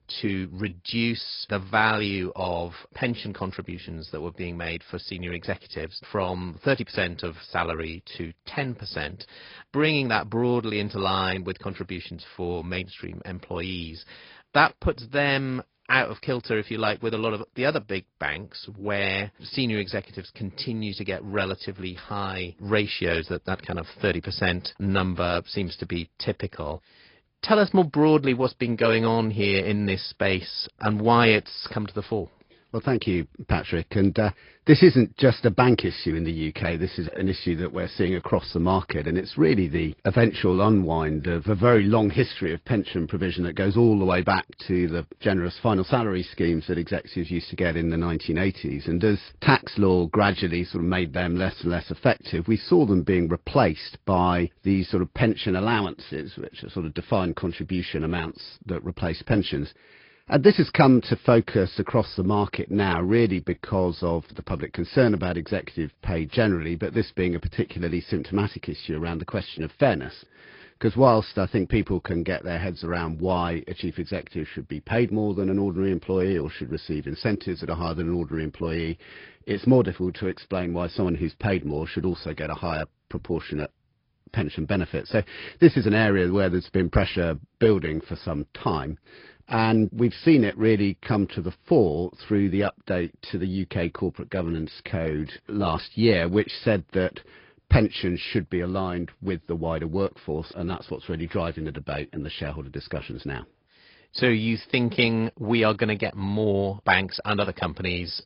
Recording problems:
high frequencies cut off; noticeable; nothing above 5 kHz
garbled, watery; slightly

